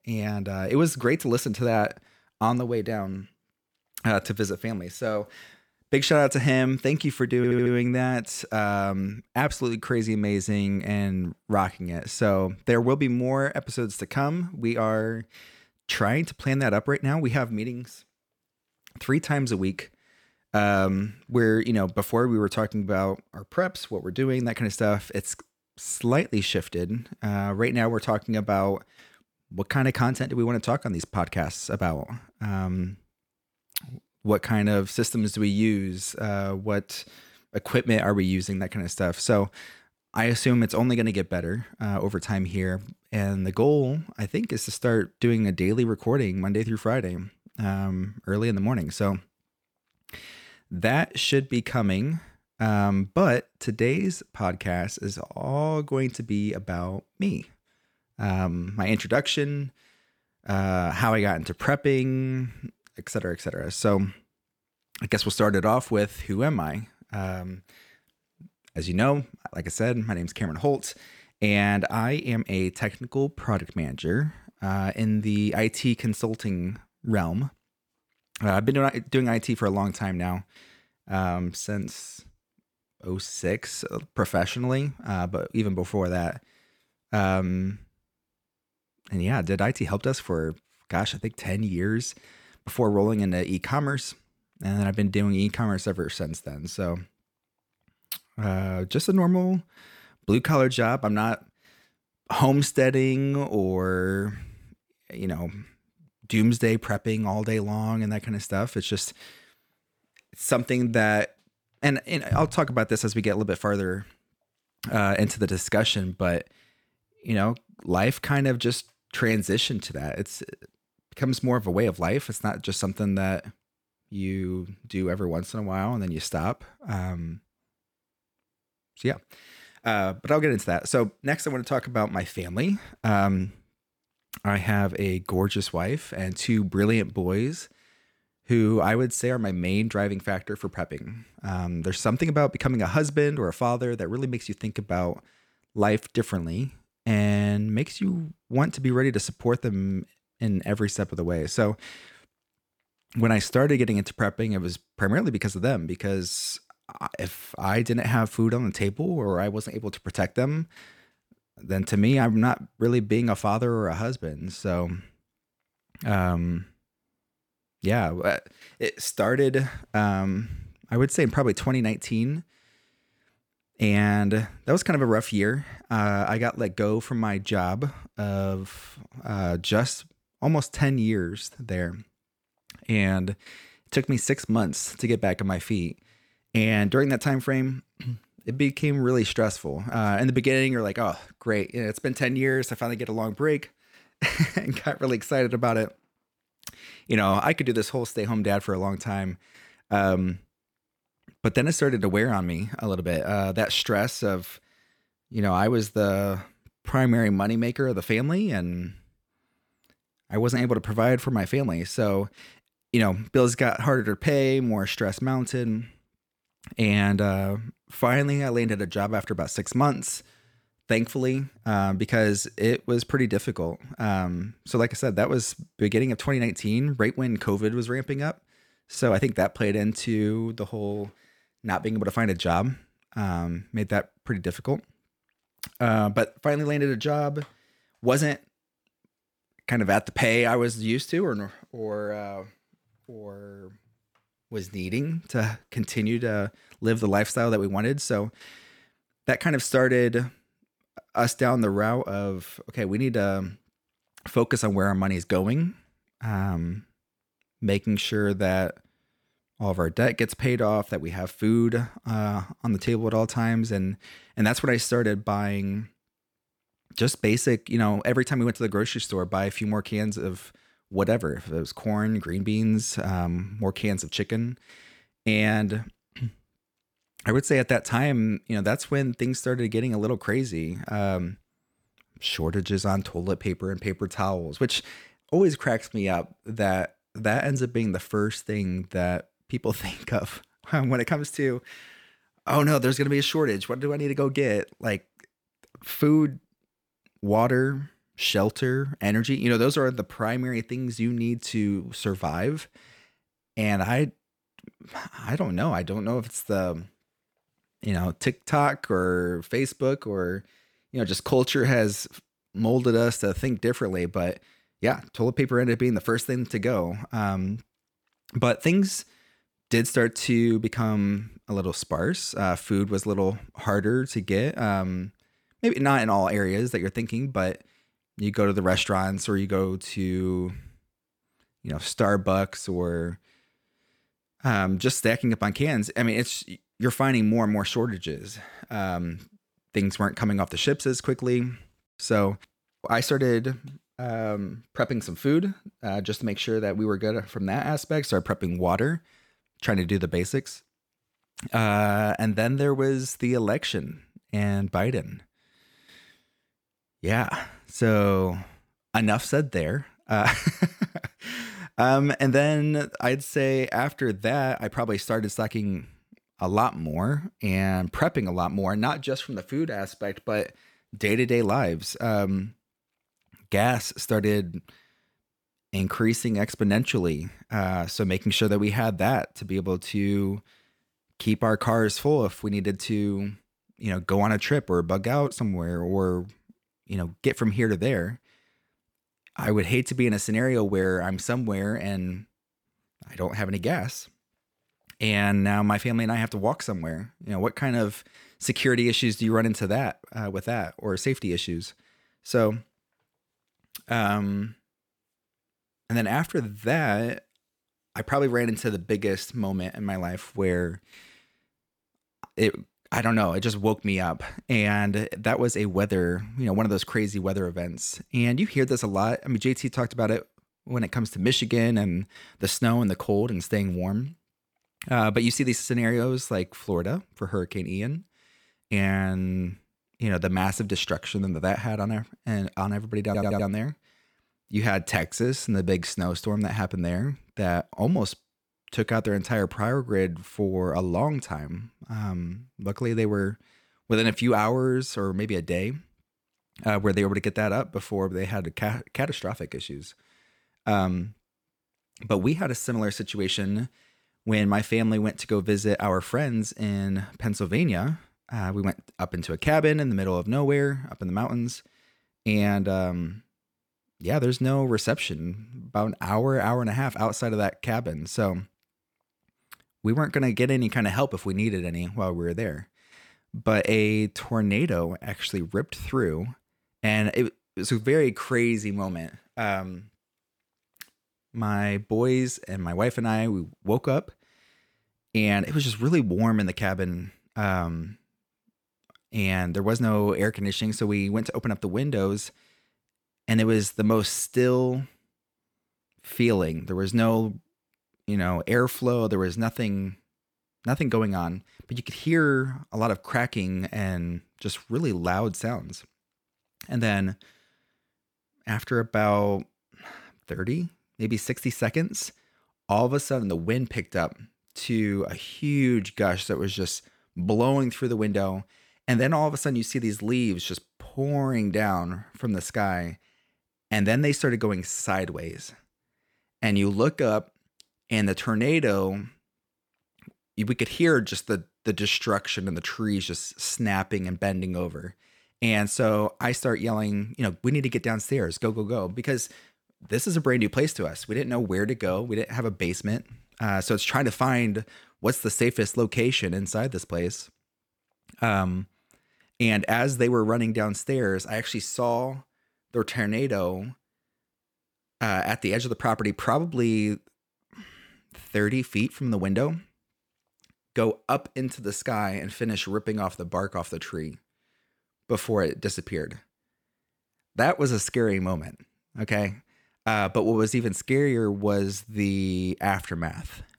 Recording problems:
audio stuttering; at 7.5 s and at 7:13

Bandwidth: 18.5 kHz